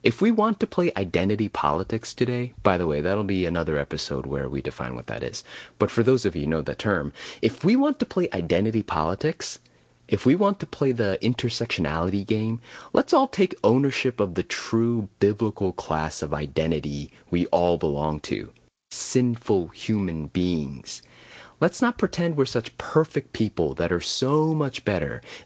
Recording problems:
garbled, watery; slightly; nothing above 7.5 kHz

